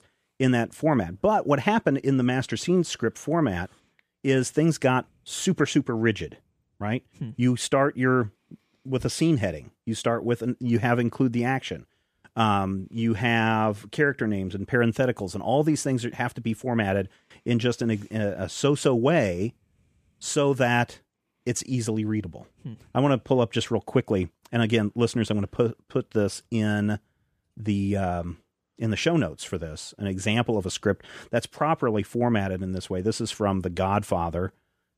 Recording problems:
none

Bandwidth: 14.5 kHz